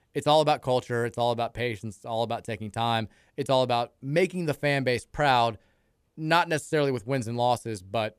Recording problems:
none

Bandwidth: 14.5 kHz